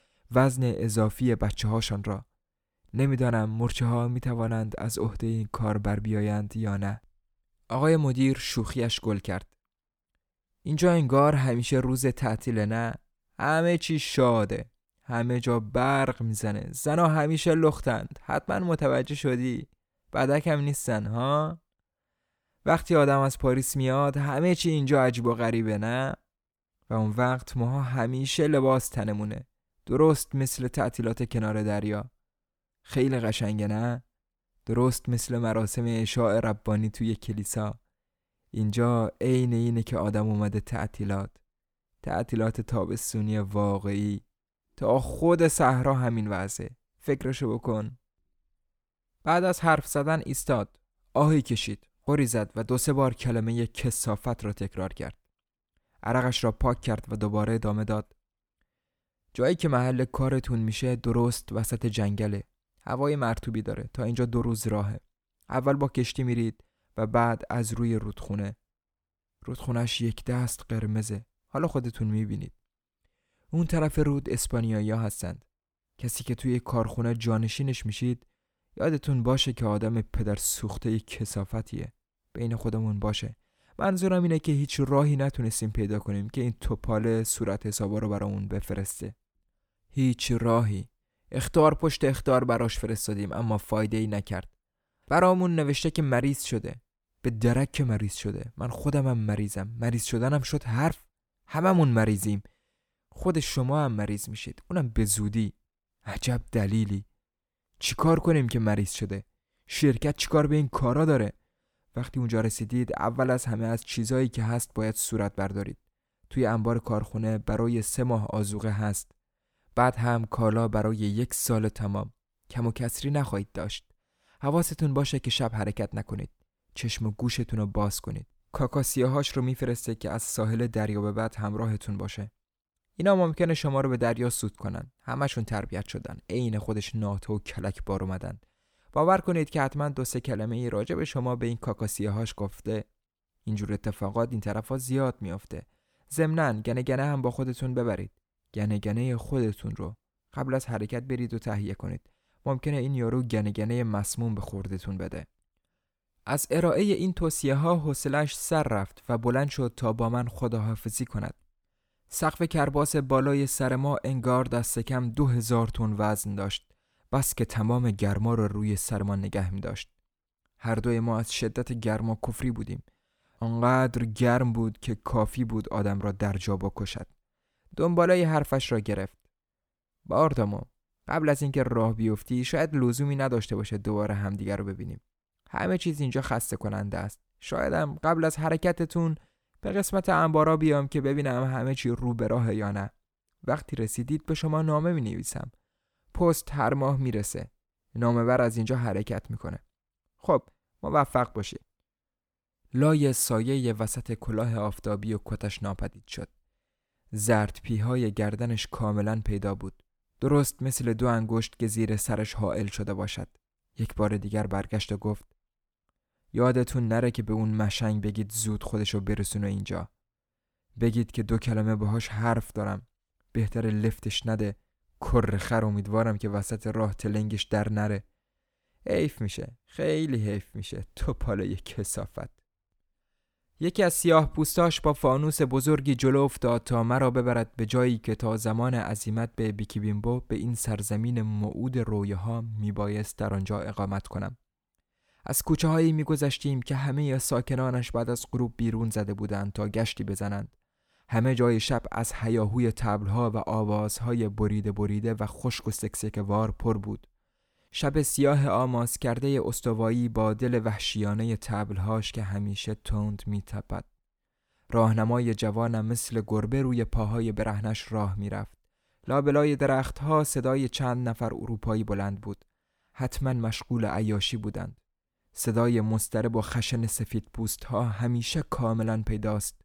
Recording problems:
none

